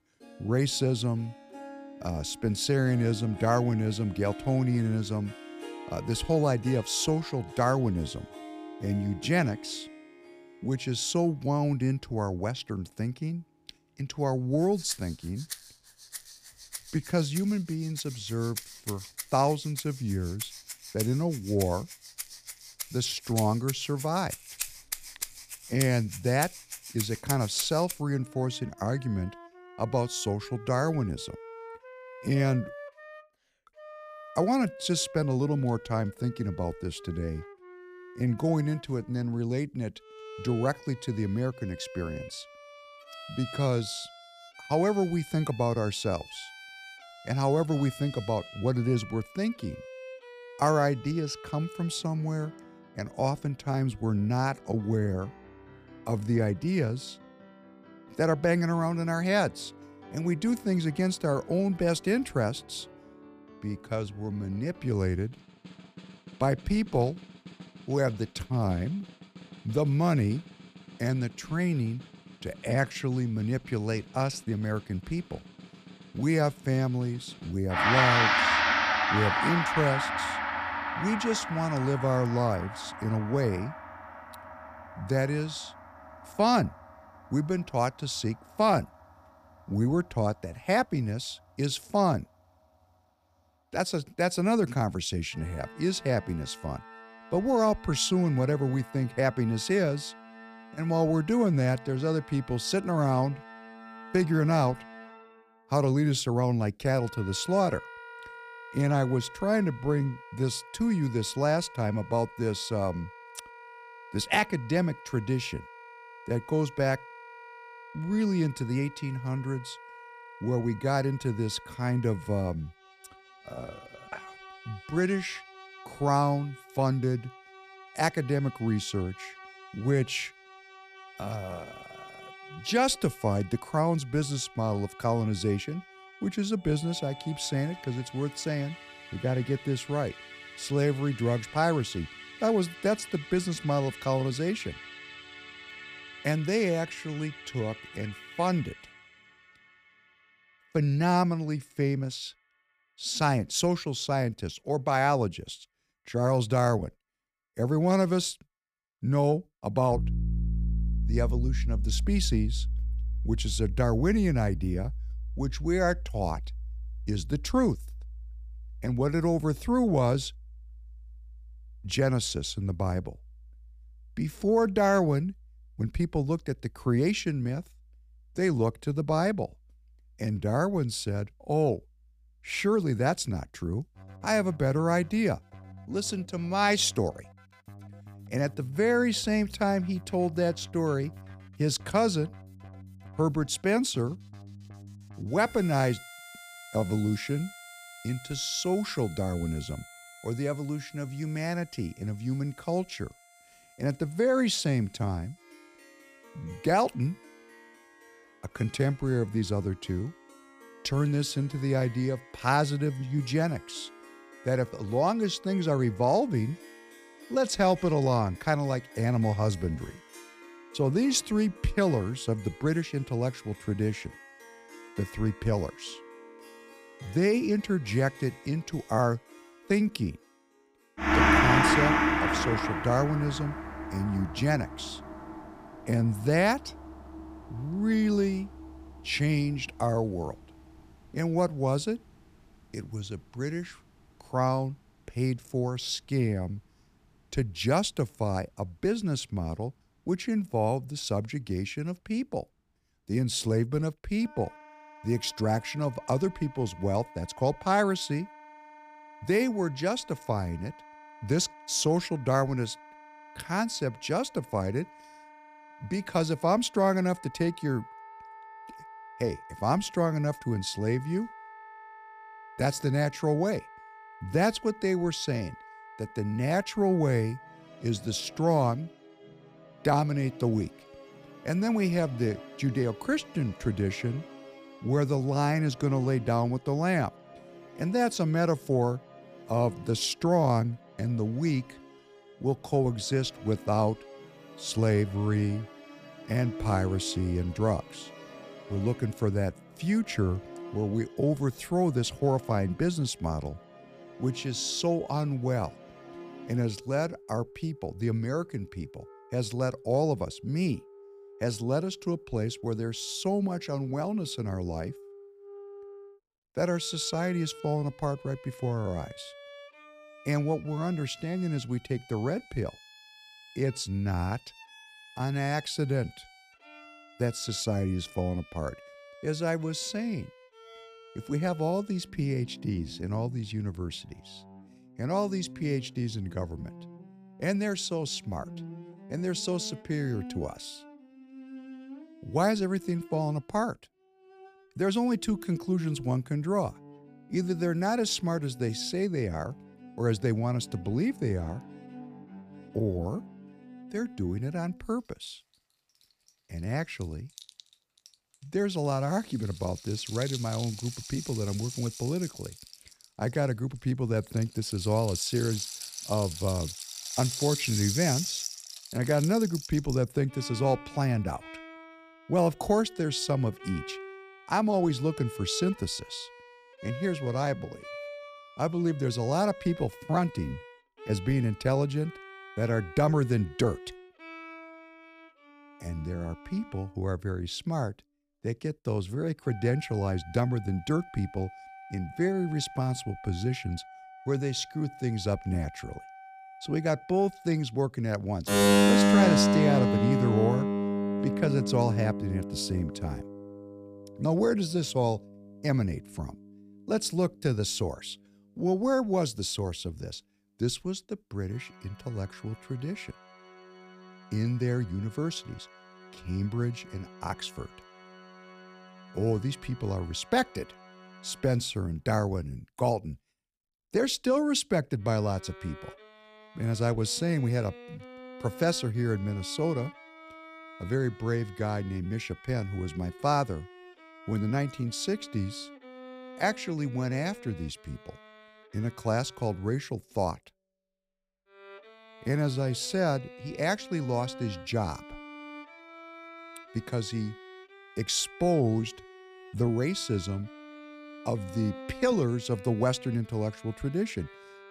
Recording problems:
background music; loud; throughout; 8 dB below the speech

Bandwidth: 15 kHz